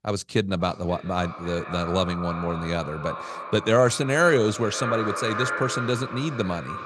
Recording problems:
echo of what is said; strong; throughout; 530 ms later, 8 dB below the speech

